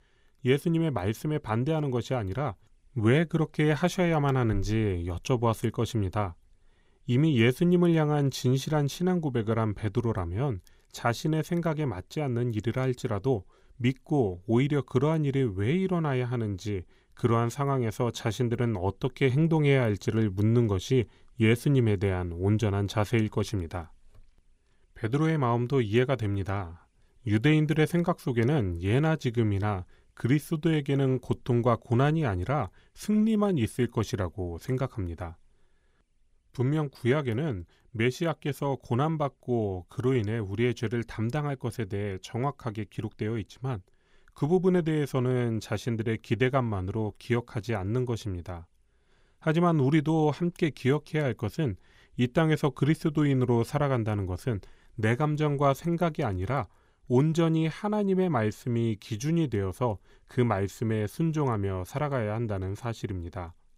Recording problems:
none

